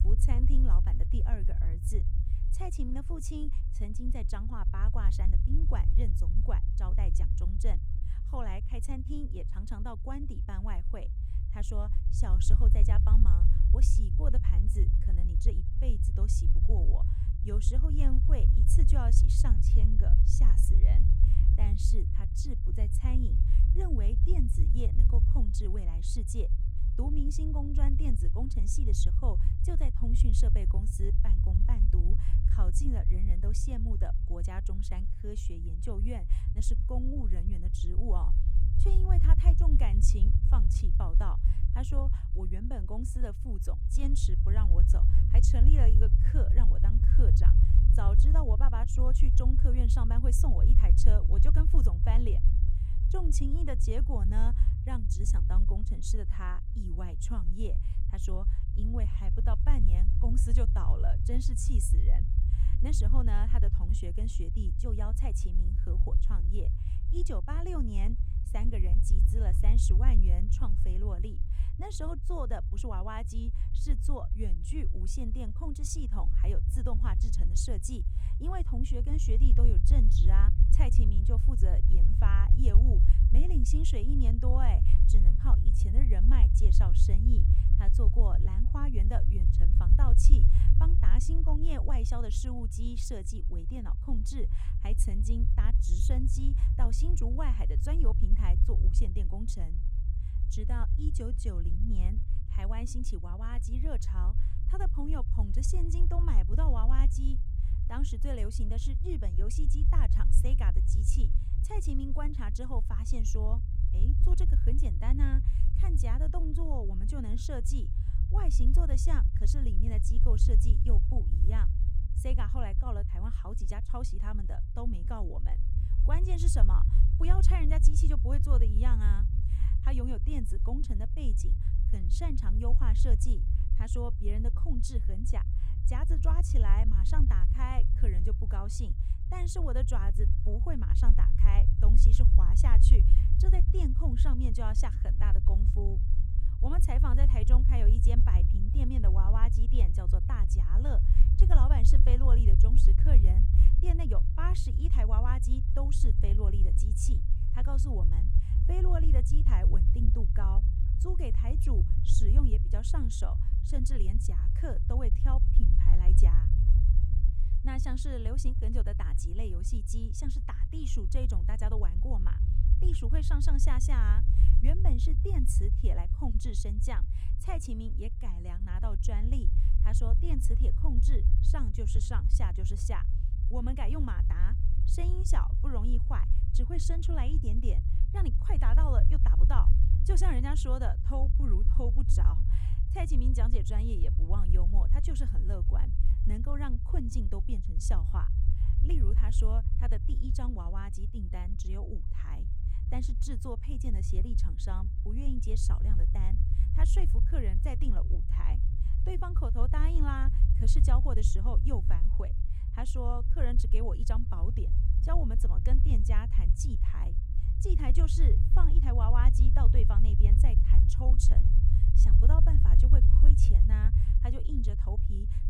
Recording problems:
low rumble; loud; throughout; 5 dB below the speech

